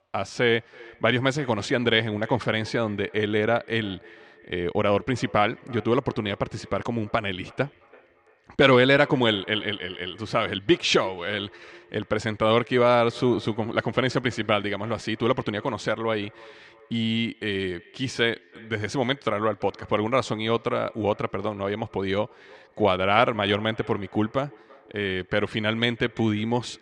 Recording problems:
echo of what is said; faint; throughout; 330 ms later, 25 dB below the speech

